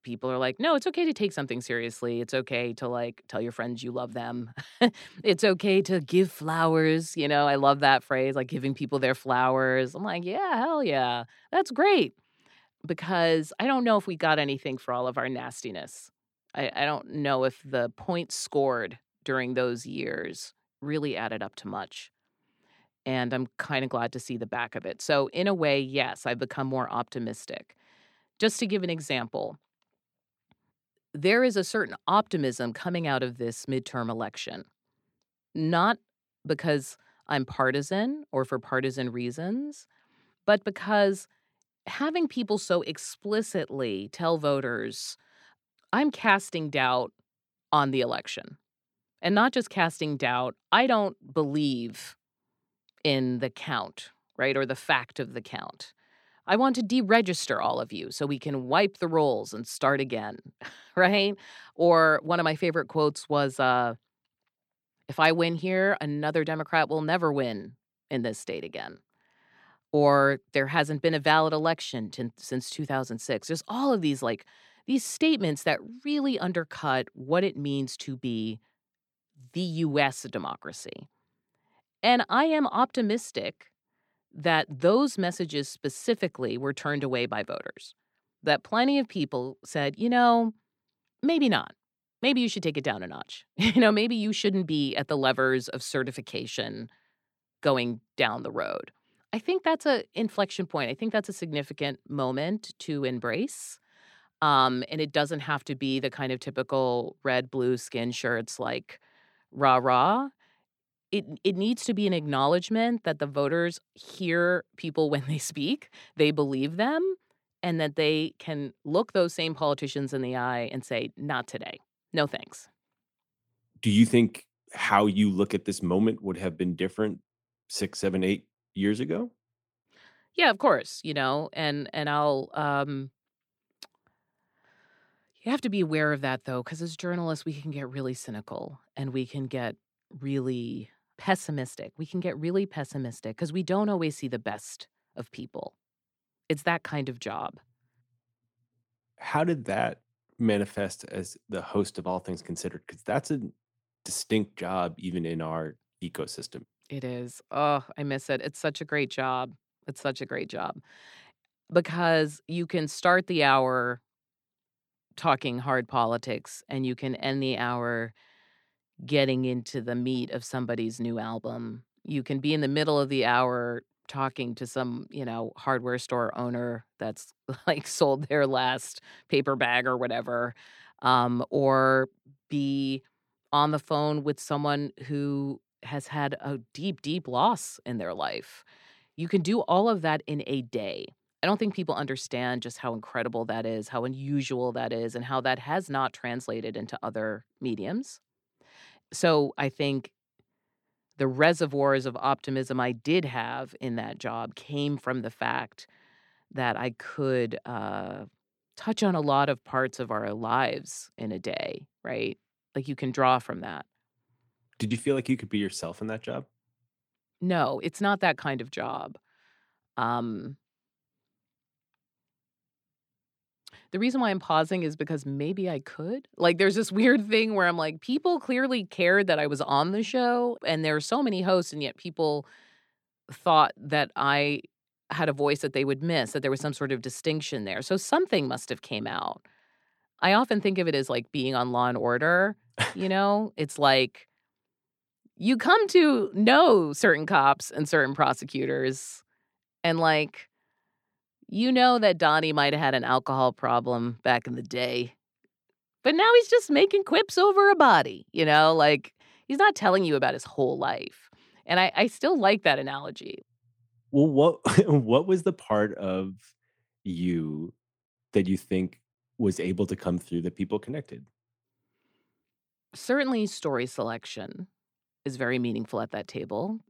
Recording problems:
none

